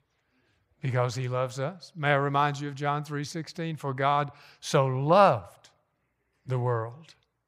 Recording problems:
none

